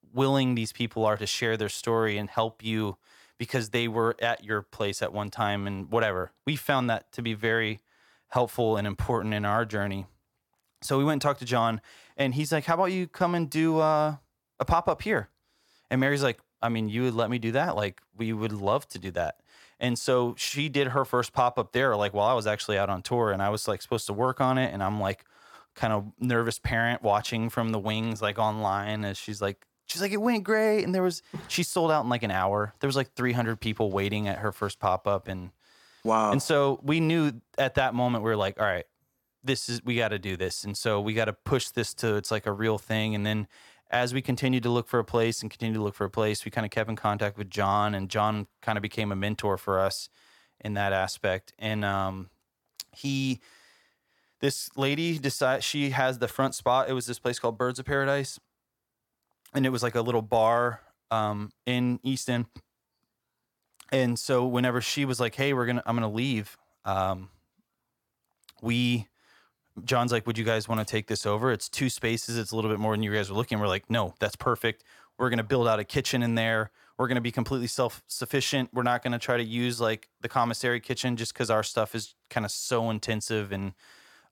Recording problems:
none

